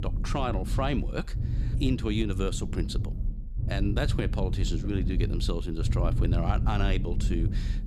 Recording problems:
low rumble; noticeable; throughout; 10 dB below the speech

